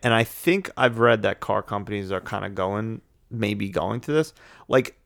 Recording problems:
none

